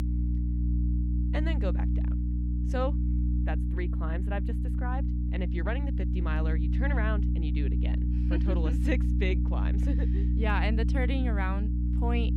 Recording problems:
electrical hum; loud; throughout; 60 Hz, 5 dB below the speech

